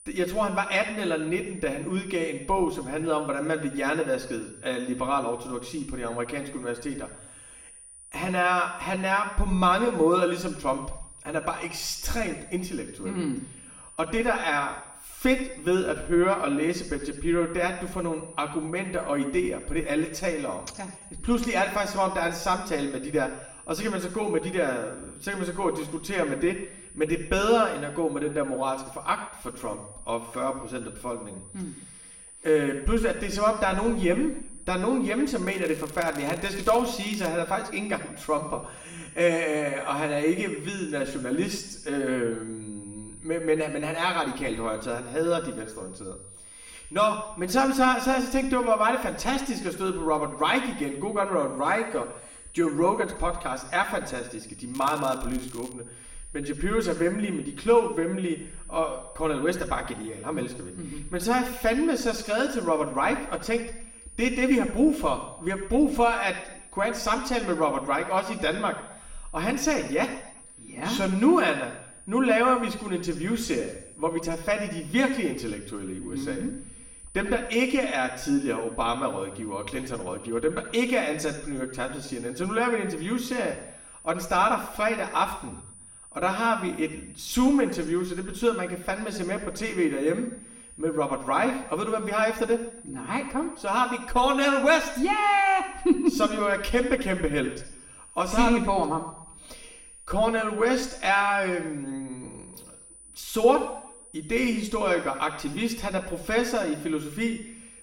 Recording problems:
room echo; slight; dies away in 0.8 s
off-mic speech; somewhat distant
high-pitched whine; noticeable; throughout; 9.5 kHz, 20 dB below the speech
crackling; noticeable; from 35 to 37 s and at 55 s; 20 dB below the speech

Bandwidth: 16.5 kHz